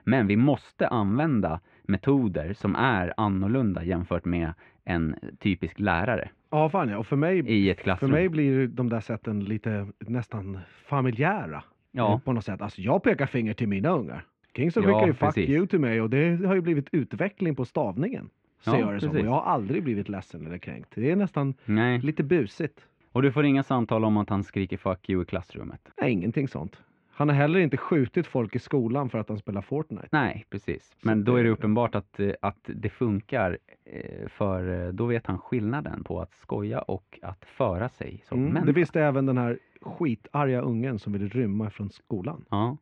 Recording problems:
muffled; very; fading above 2.5 kHz

